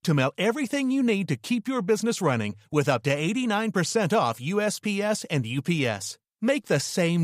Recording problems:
abrupt cut into speech; at the end

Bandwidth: 15 kHz